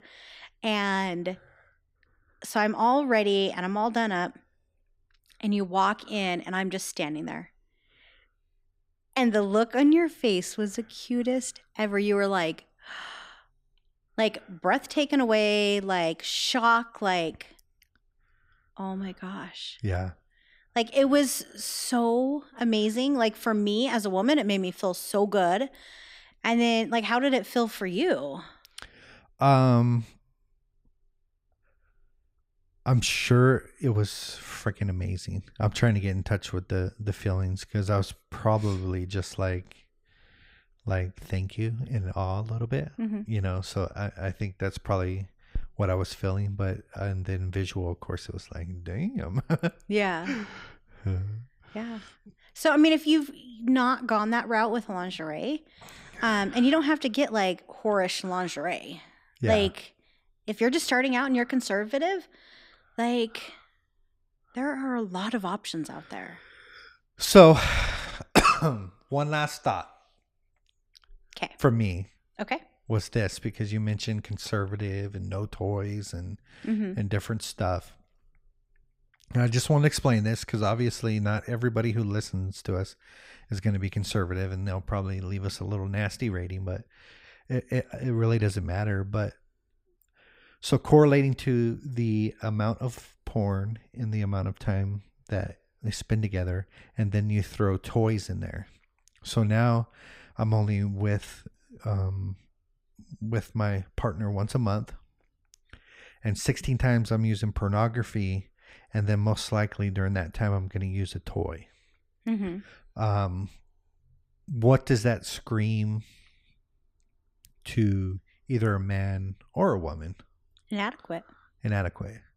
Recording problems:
none

